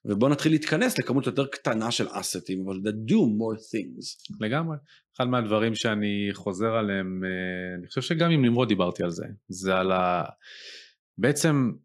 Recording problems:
none

